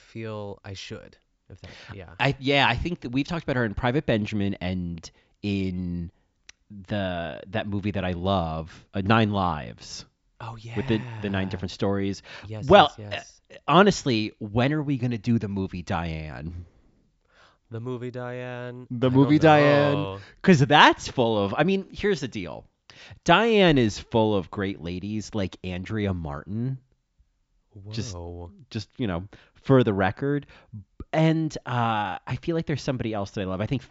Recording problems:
high frequencies cut off; noticeable; nothing above 8 kHz

